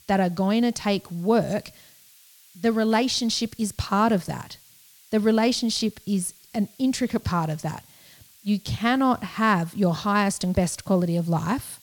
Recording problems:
hiss; faint; throughout; 25 dB below the speech

